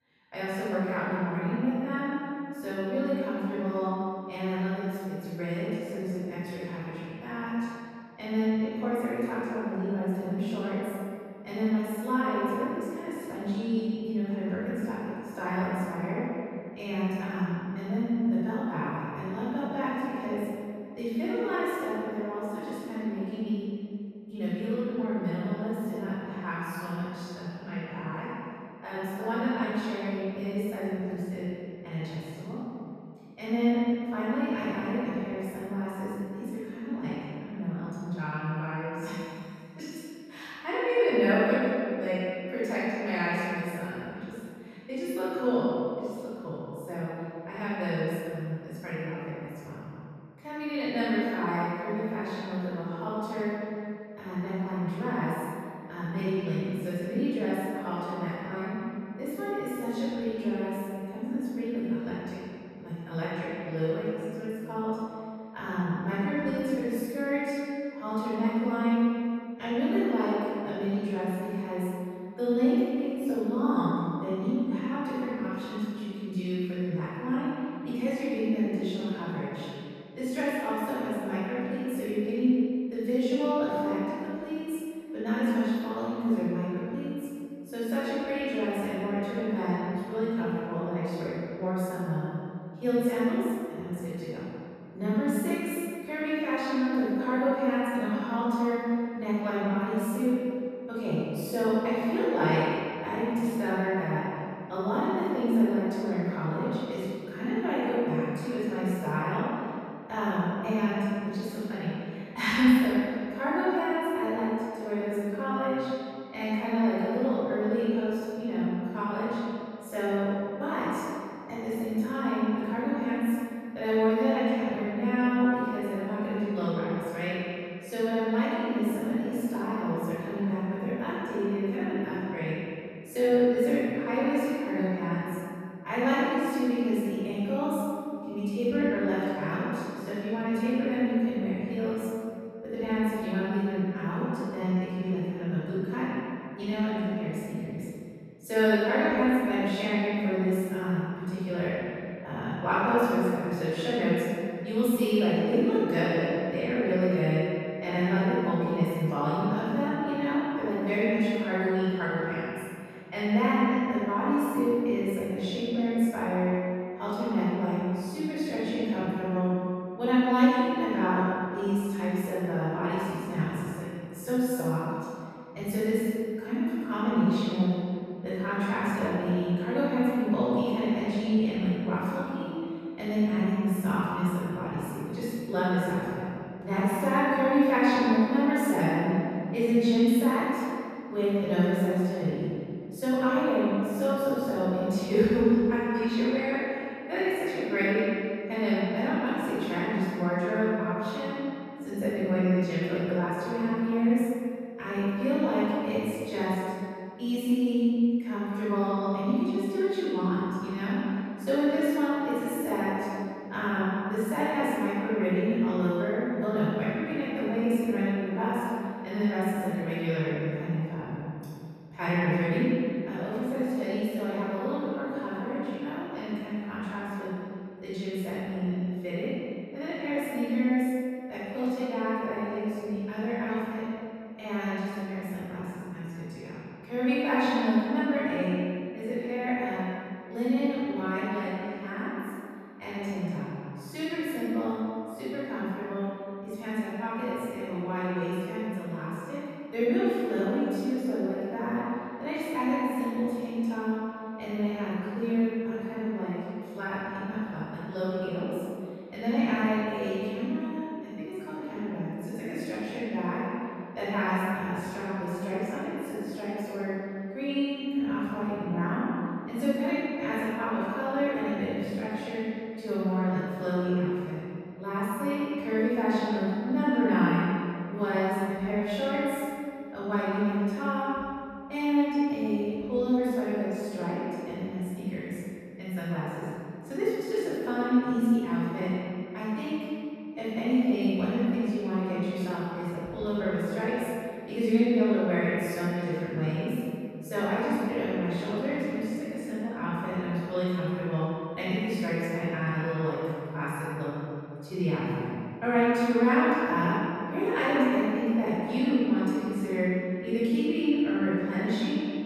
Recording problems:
room echo; strong; dies away in 2.2 s
off-mic speech; far

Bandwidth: 14.5 kHz